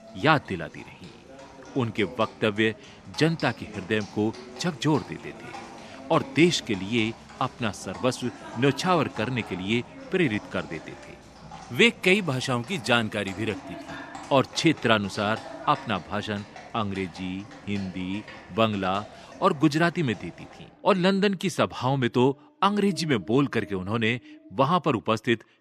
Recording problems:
animal sounds; noticeable; throughout; 20 dB below the speech

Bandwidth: 13.5 kHz